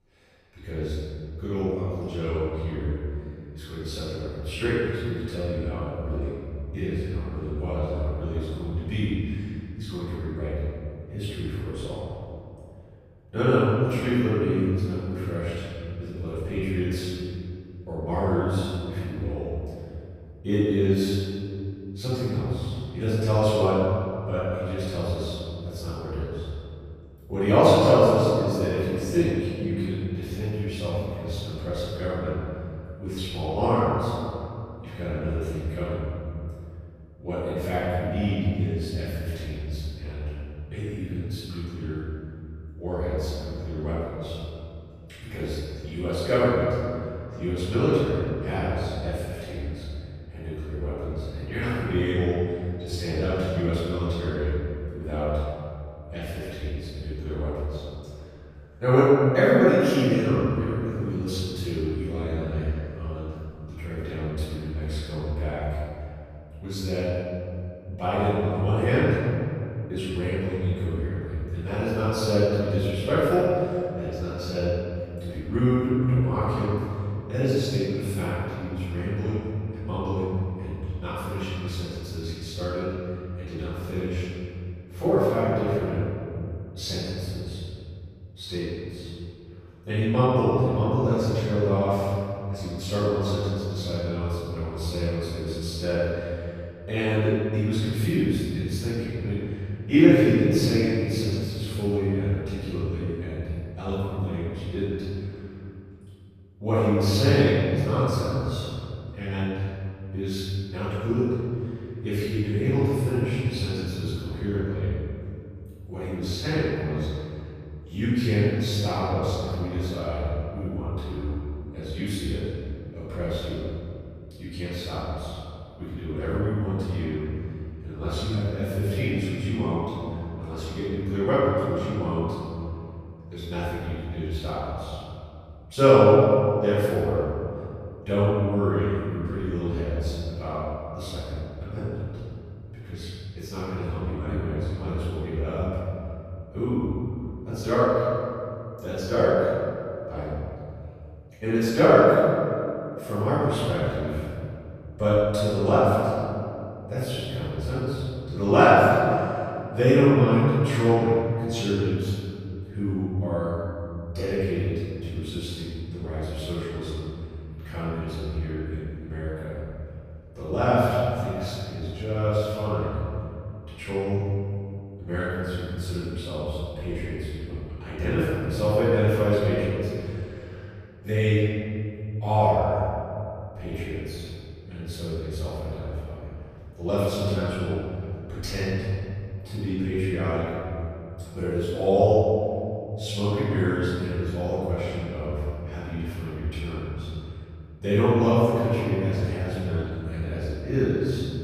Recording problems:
room echo; strong; dies away in 2.6 s
off-mic speech; far

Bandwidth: 14.5 kHz